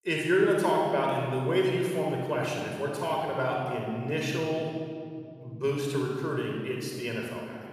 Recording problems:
room echo; strong; dies away in 2.2 s
off-mic speech; somewhat distant

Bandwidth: 14.5 kHz